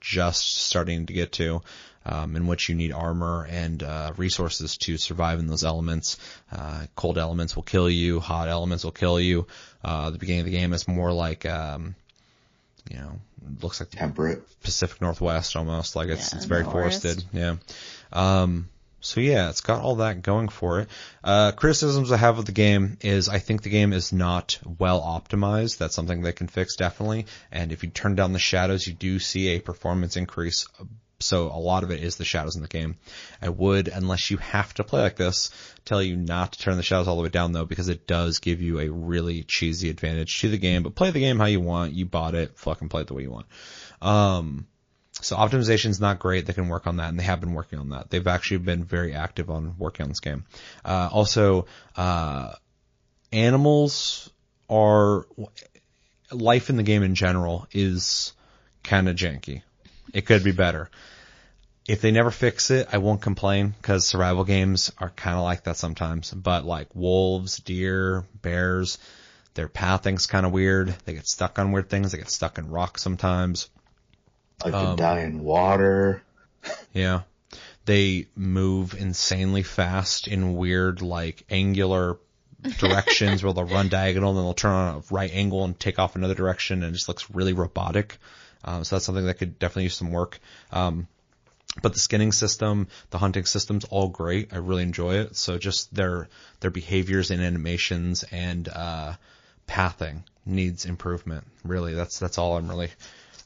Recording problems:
garbled, watery; slightly; nothing above 6.5 kHz

